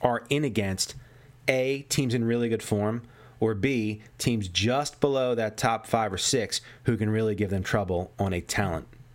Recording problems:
squashed, flat; somewhat

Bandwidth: 16 kHz